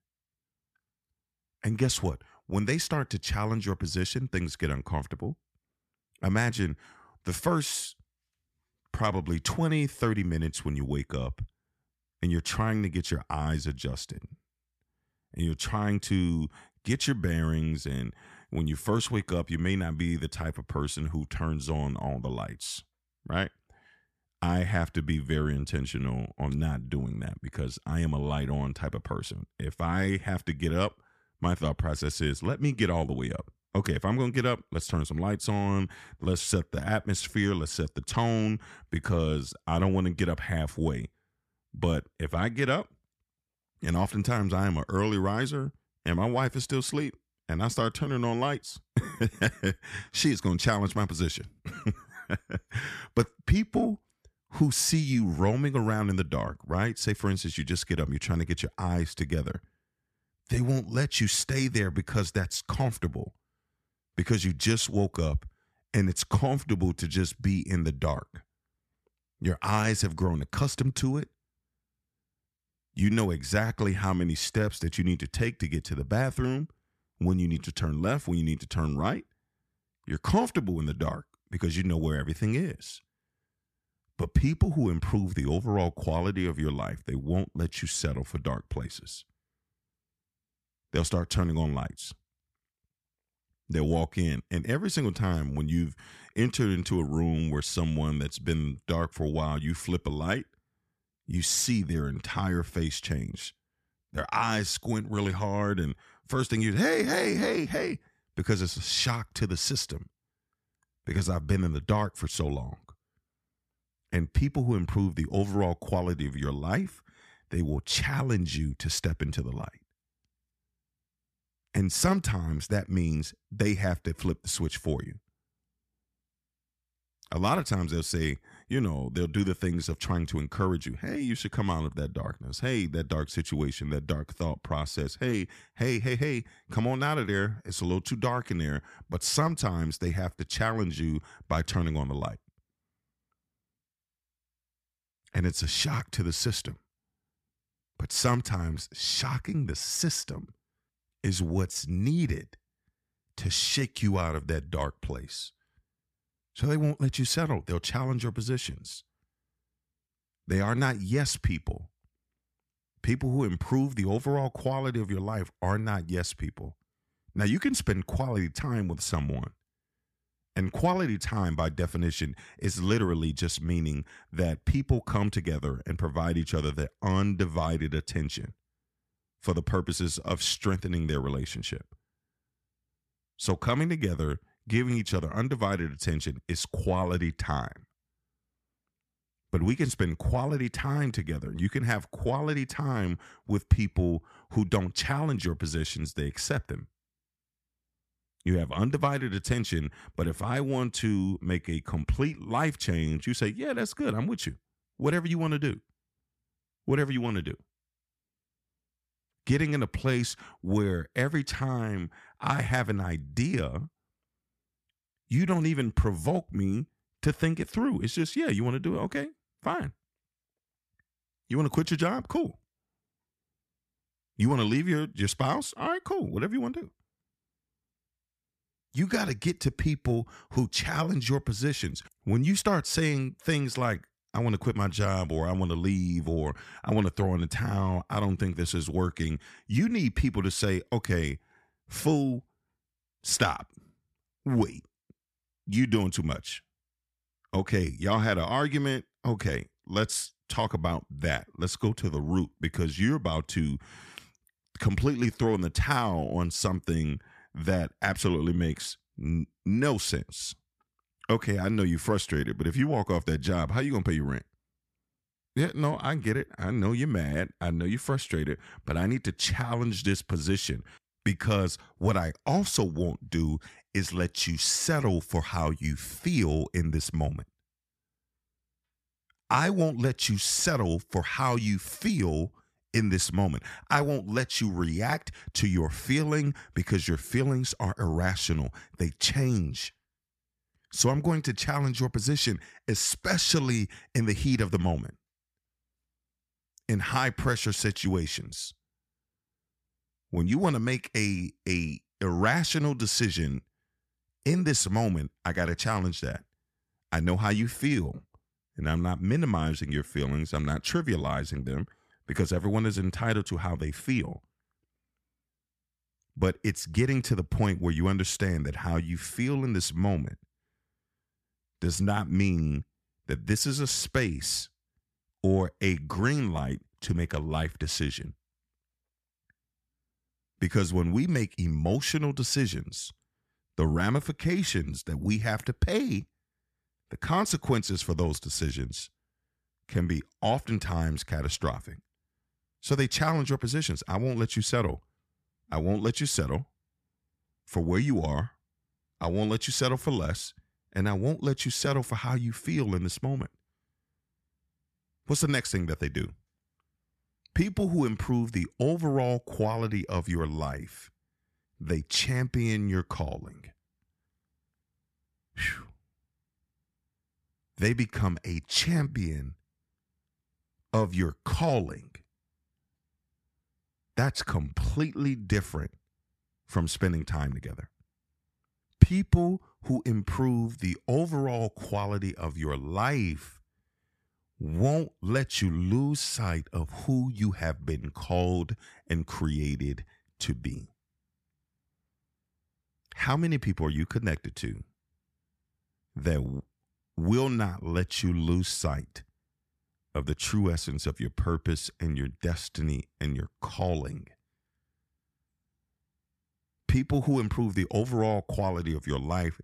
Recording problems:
none

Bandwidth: 14.5 kHz